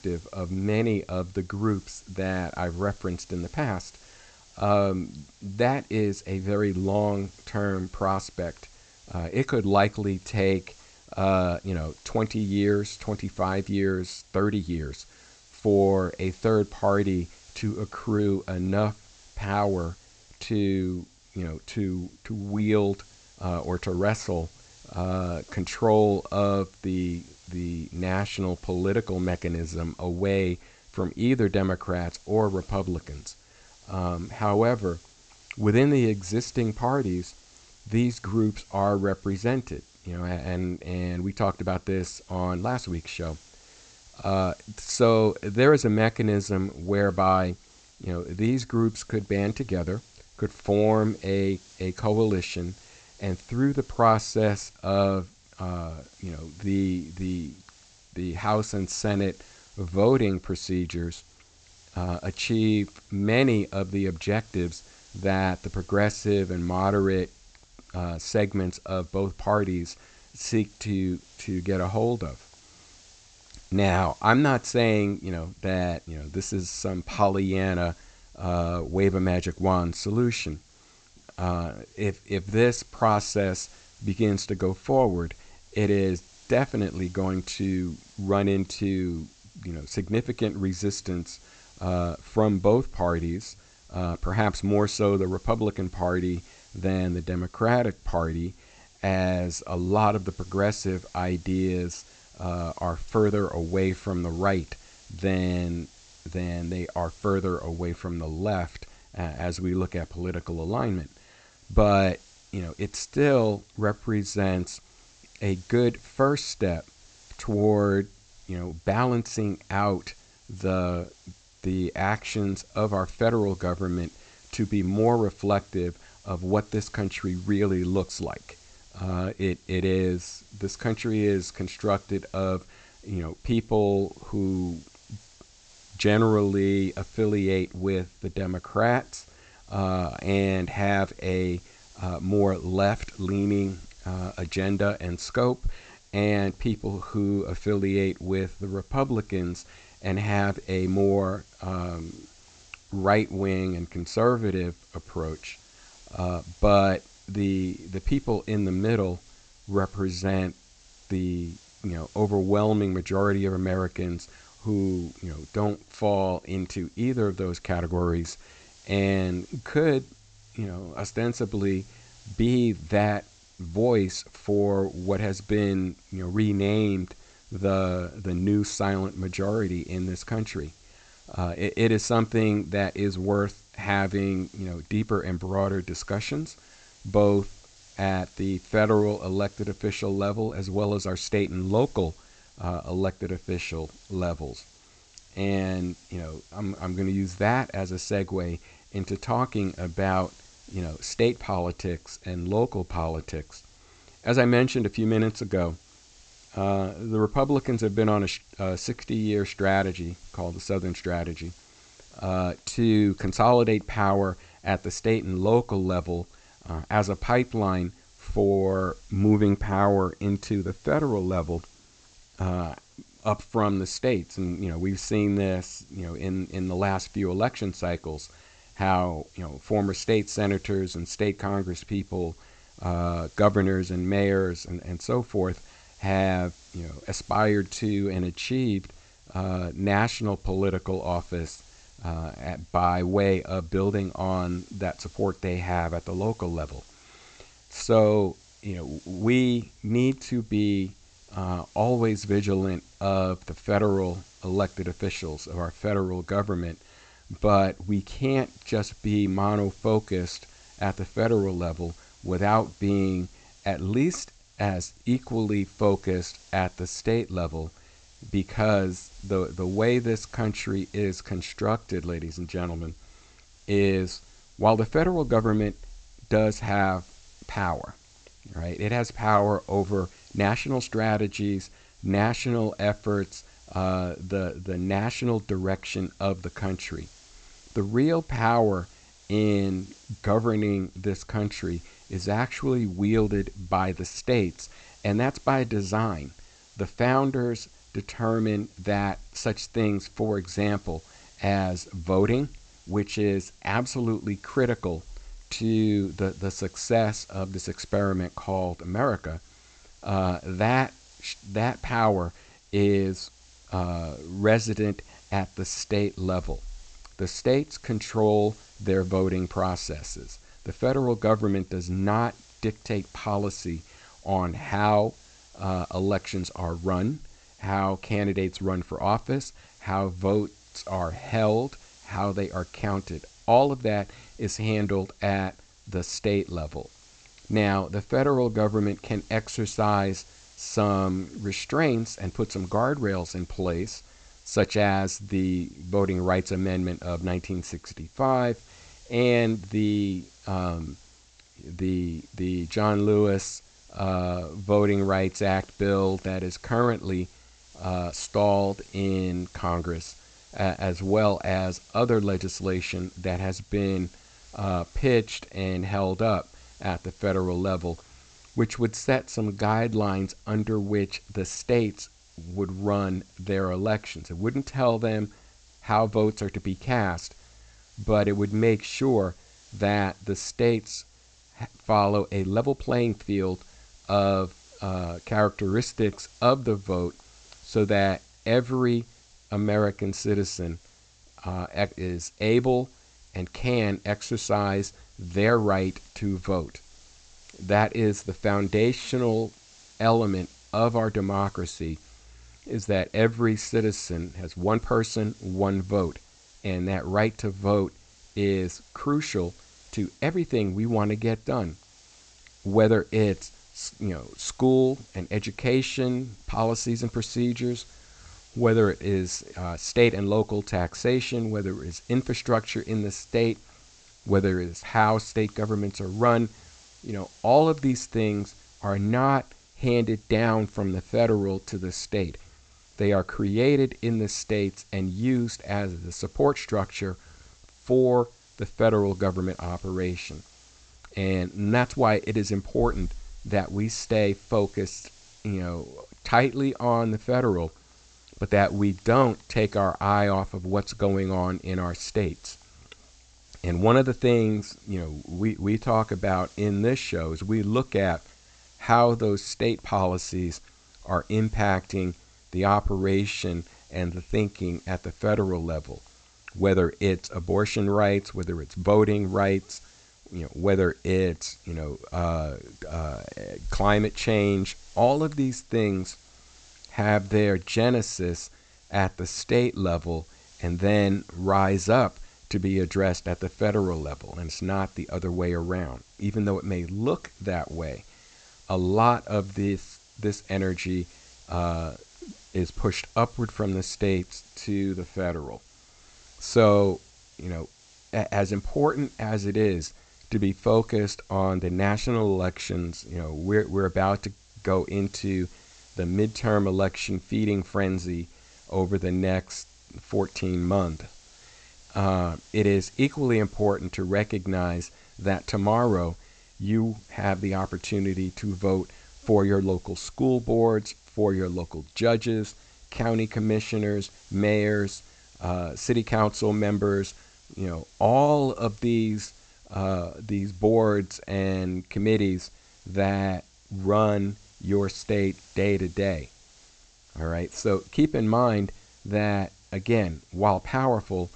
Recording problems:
high frequencies cut off; noticeable; nothing above 8 kHz
hiss; faint; throughout; 25 dB below the speech

